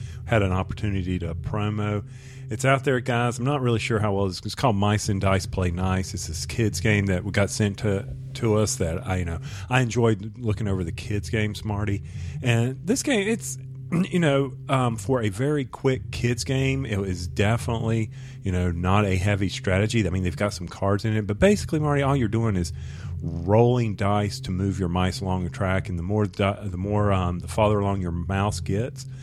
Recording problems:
low rumble; faint; throughout; 20 dB below the speech

